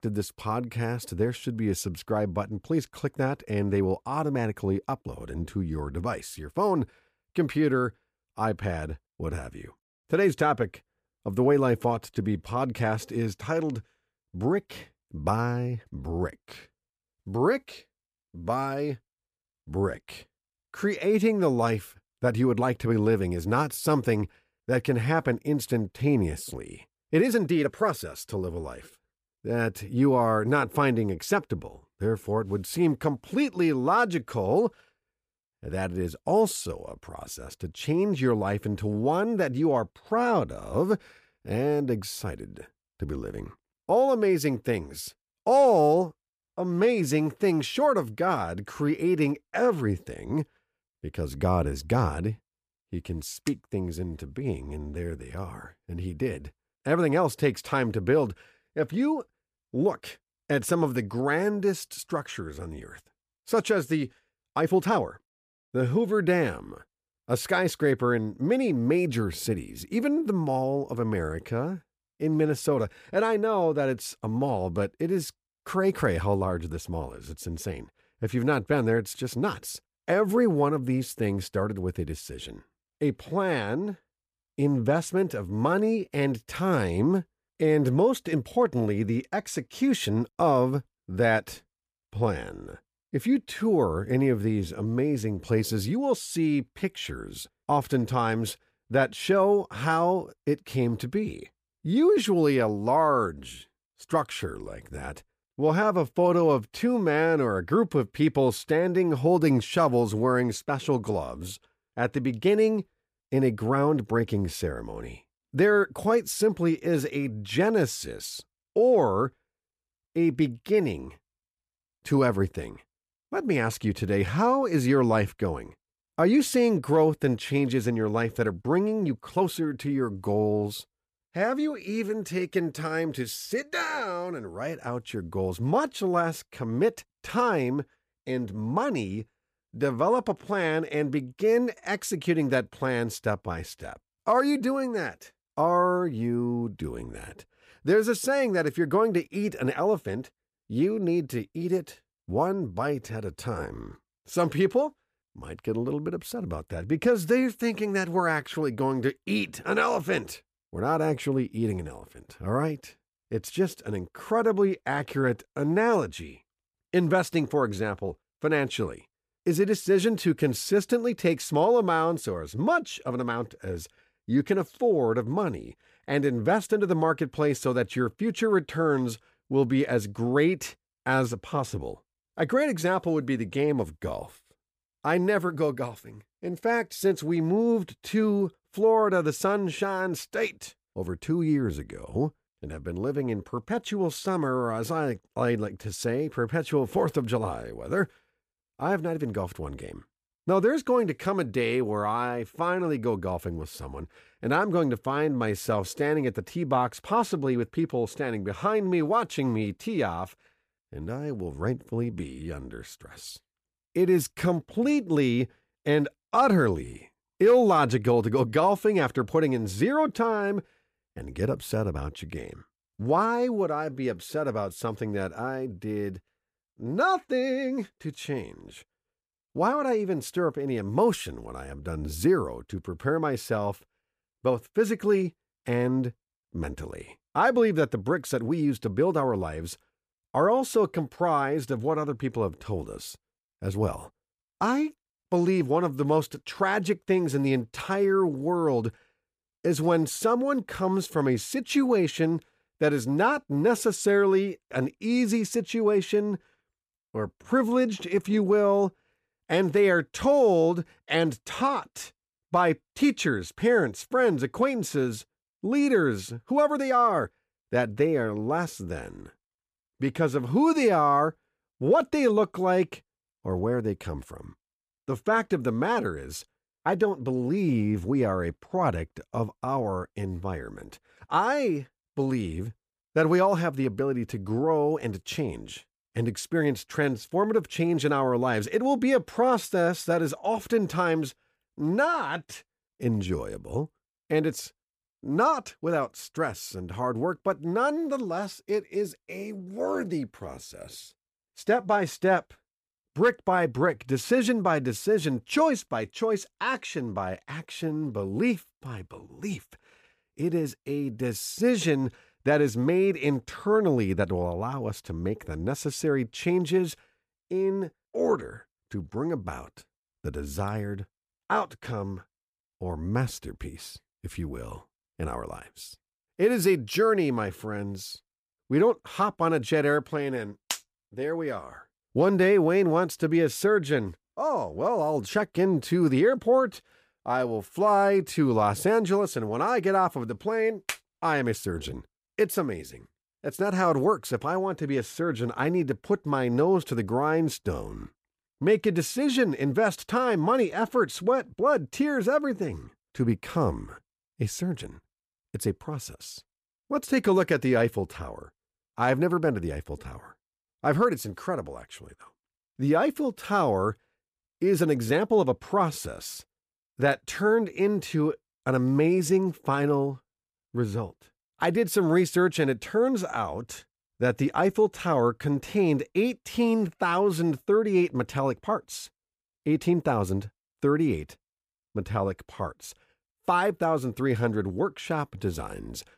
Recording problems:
uneven, jittery; strongly; from 5 s to 6:06

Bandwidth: 15 kHz